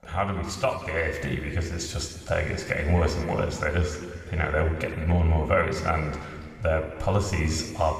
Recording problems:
room echo; noticeable; dies away in 2 s
off-mic speech; somewhat distant

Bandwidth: 15 kHz